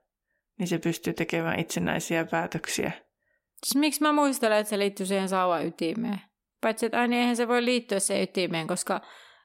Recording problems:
none

